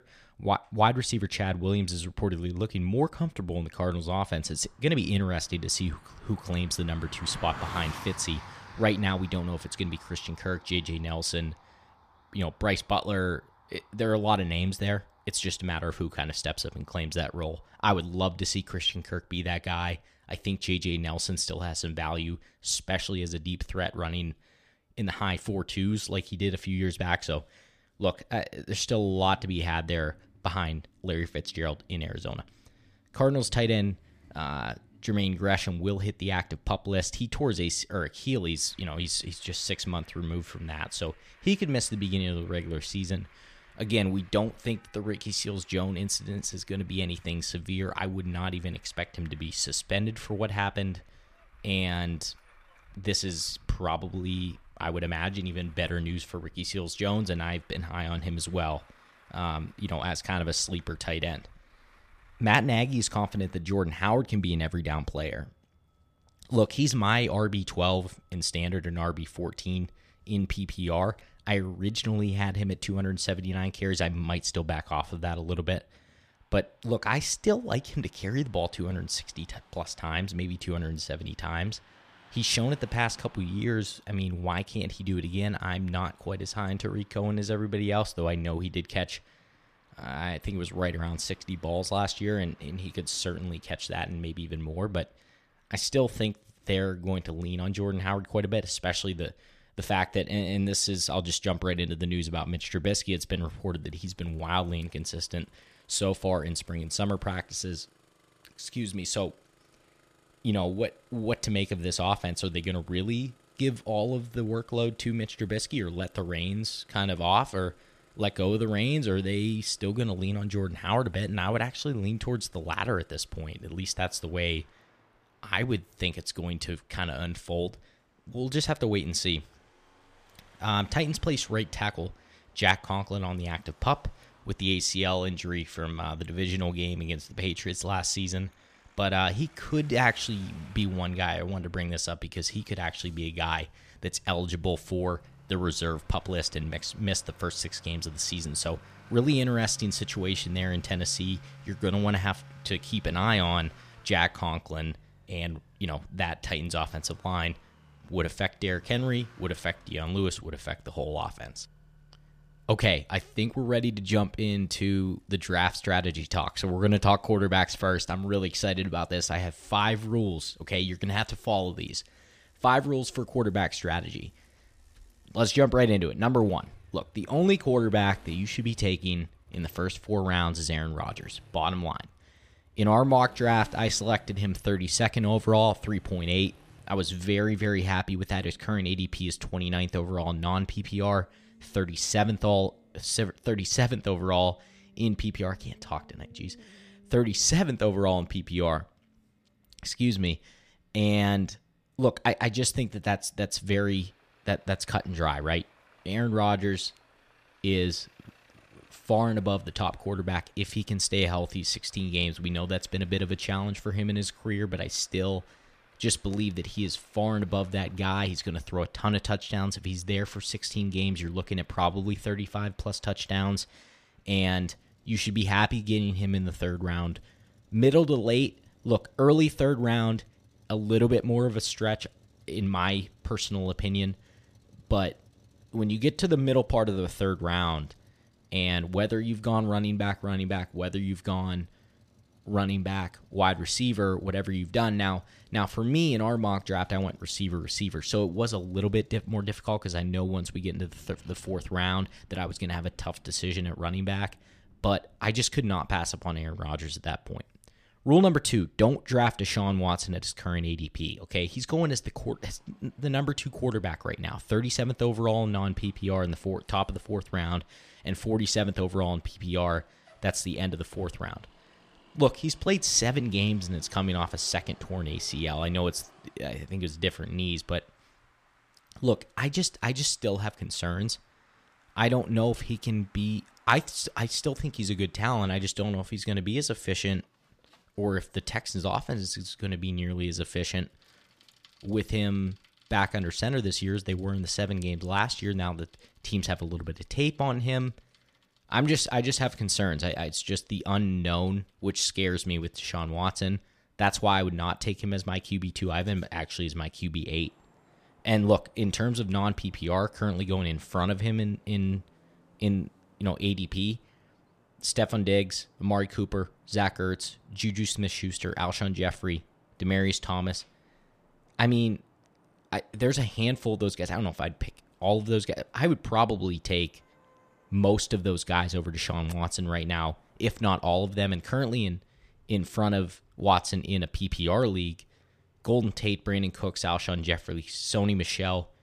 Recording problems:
traffic noise; faint; throughout; 30 dB below the speech

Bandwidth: 14.5 kHz